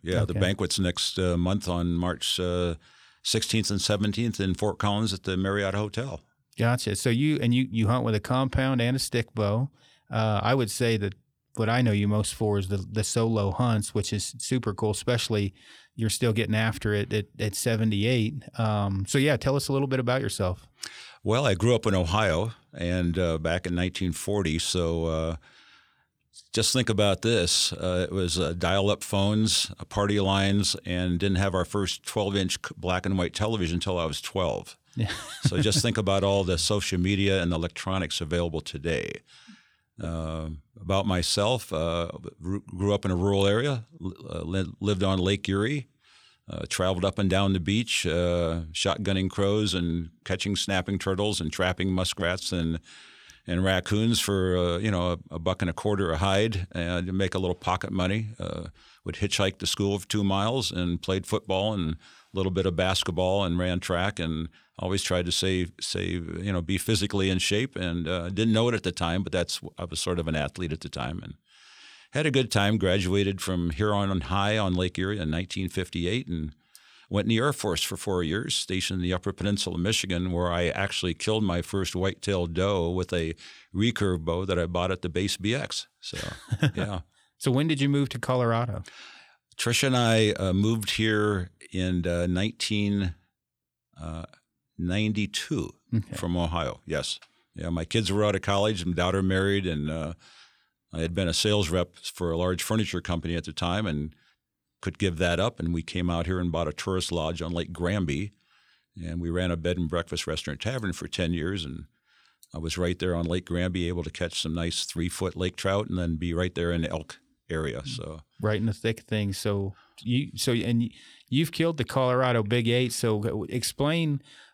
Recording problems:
none

